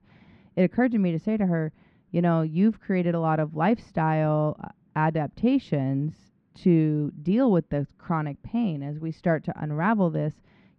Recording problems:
muffled; very; fading above 2 kHz

